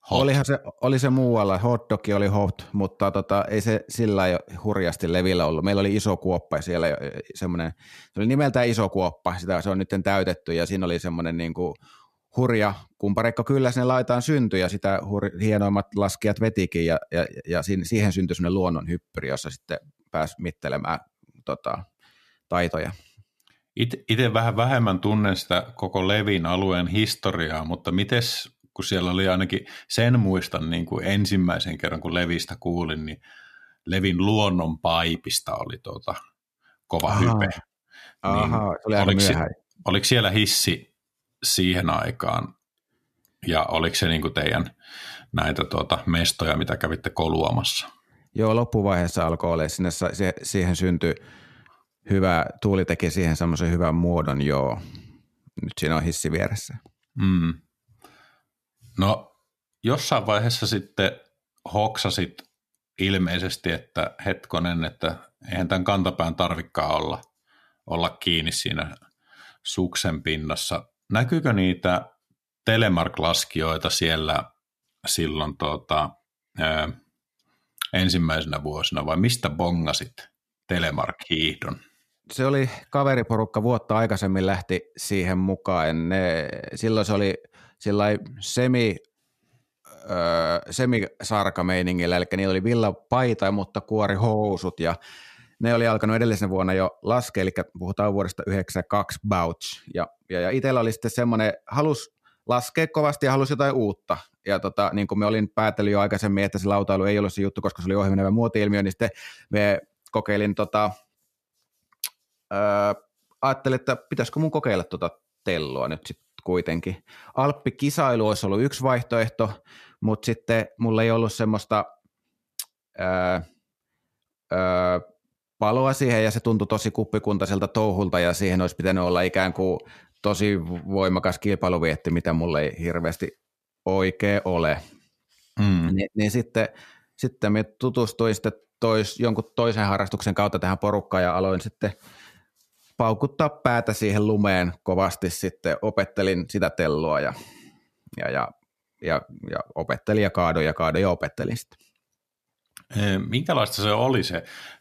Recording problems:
none

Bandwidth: 14.5 kHz